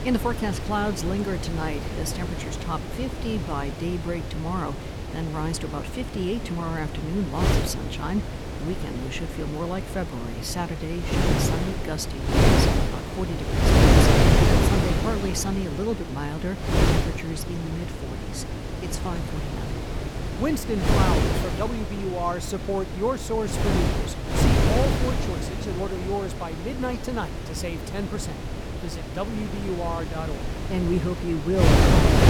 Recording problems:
wind noise on the microphone; heavy; 2 dB above the speech

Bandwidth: 18.5 kHz